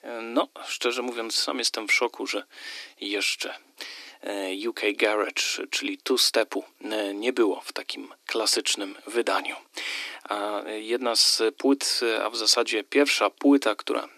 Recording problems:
thin; somewhat; fading below 300 Hz

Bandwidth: 13.5 kHz